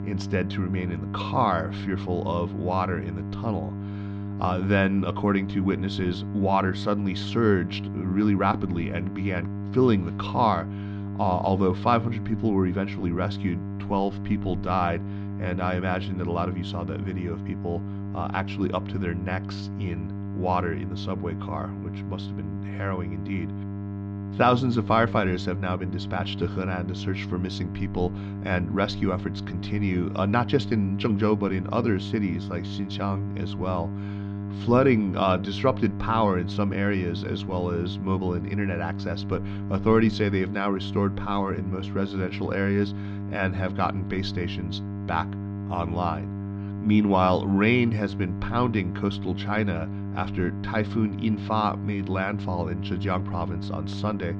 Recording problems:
muffled; very slightly; fading above 4.5 kHz
electrical hum; noticeable; throughout; 50 Hz, 15 dB below the speech

